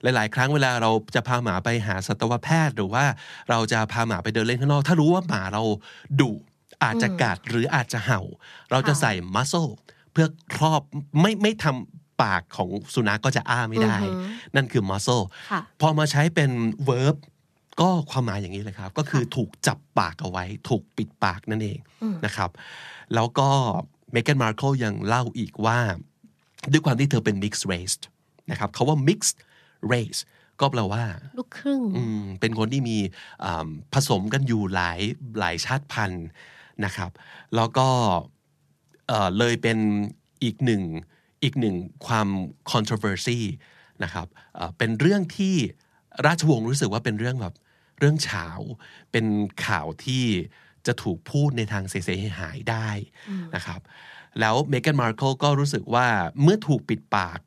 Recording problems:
none

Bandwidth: 14 kHz